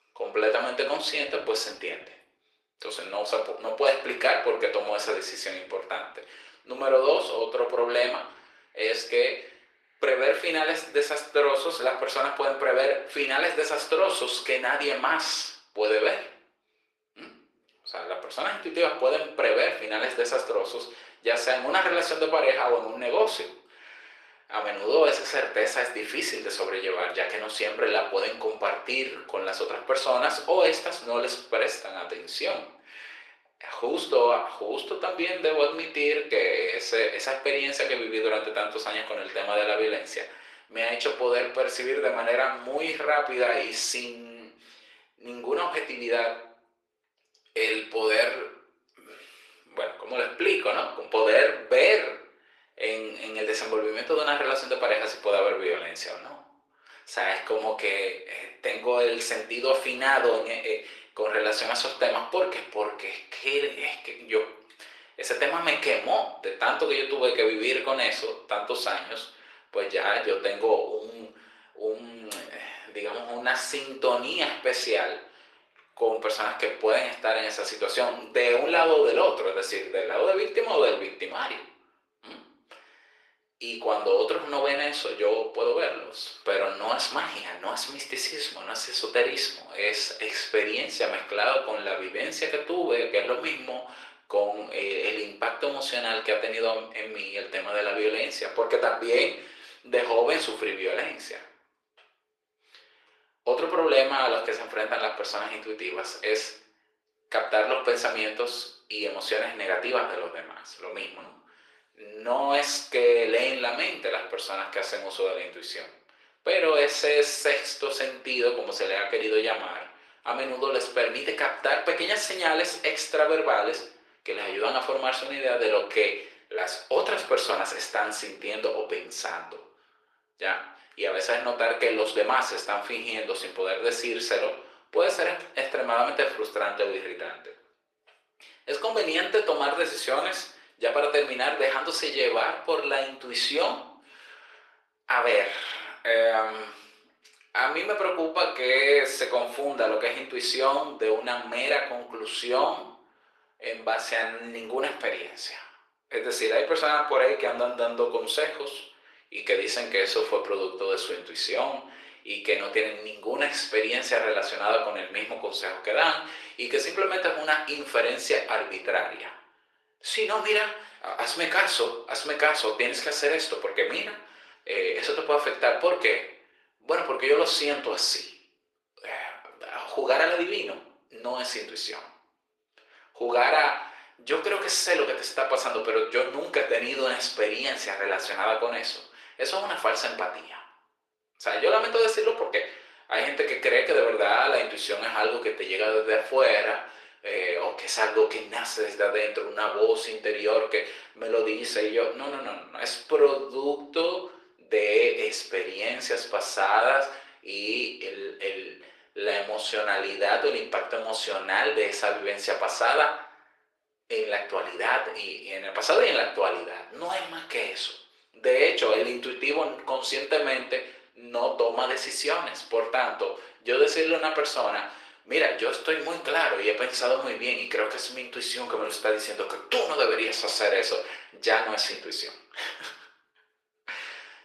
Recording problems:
thin; very; fading below 400 Hz
room echo; slight; dies away in 0.4 s
off-mic speech; somewhat distant
garbled, watery; slightly; nothing above 14 kHz

